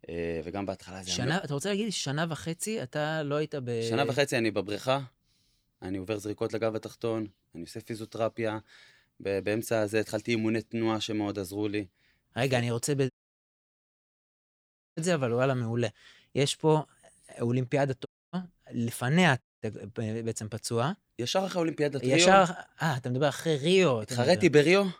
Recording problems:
audio cutting out; at 13 s for 2 s, at 18 s and at 19 s

